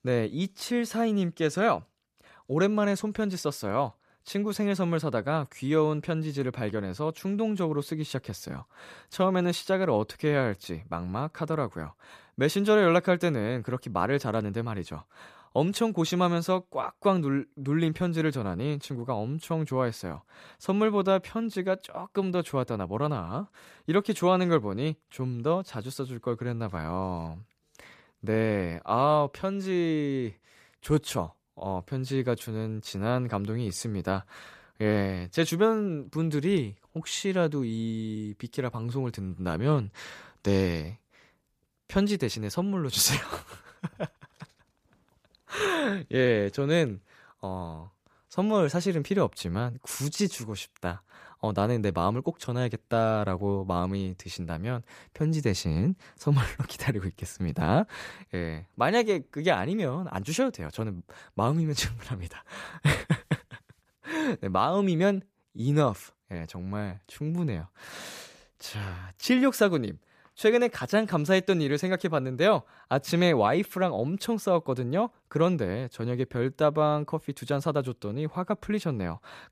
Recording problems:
none

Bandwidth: 14.5 kHz